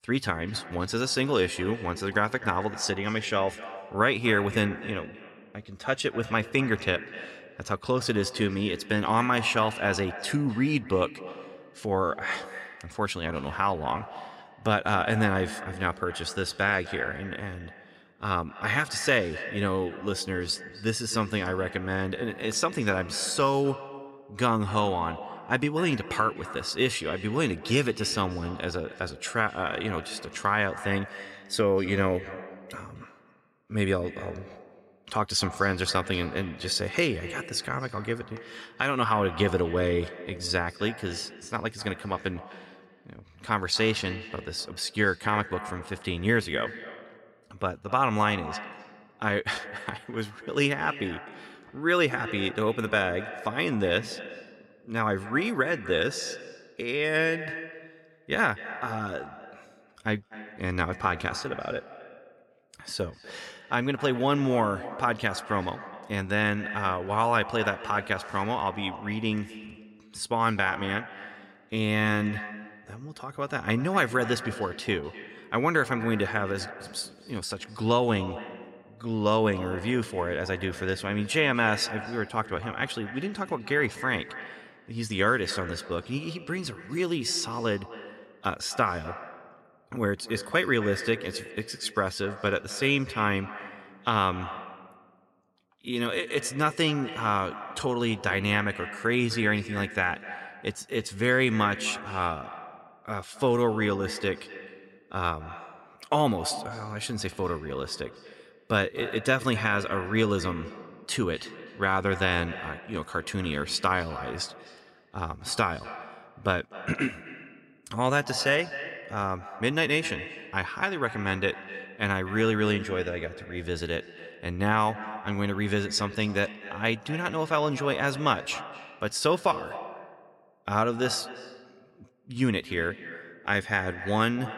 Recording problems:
echo of what is said; noticeable; throughout; 250 ms later, 15 dB below the speech

